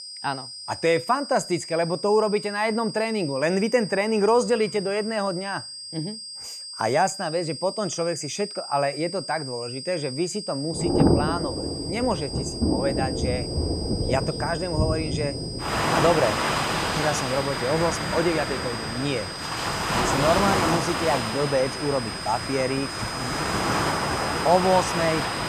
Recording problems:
high-pitched whine; loud; throughout; 5 kHz, 8 dB below the speech
rain or running water; loud; from 11 s on; 1 dB below the speech

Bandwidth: 15 kHz